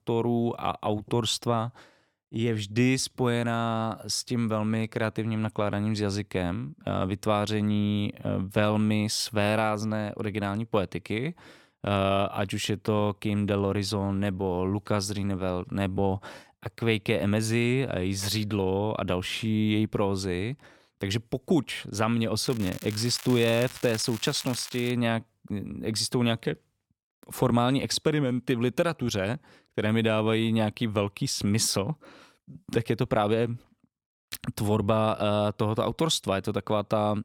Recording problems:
crackling; noticeable; from 22 to 25 s; 15 dB below the speech

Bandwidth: 17 kHz